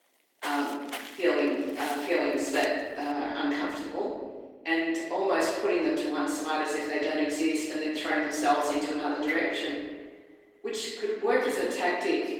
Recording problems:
off-mic speech; far
room echo; noticeable; dies away in 1.3 s
garbled, watery; slightly; nothing above 17 kHz
thin; very slightly; fading below 300 Hz
footsteps; noticeable; until 3 s; peak 8 dB below the speech
clattering dishes; noticeable; at 9.5 s; peak 5 dB below the speech

